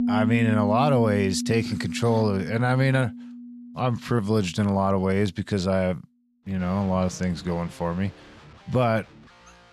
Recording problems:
background music; loud; throughout; 6 dB below the speech

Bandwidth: 14 kHz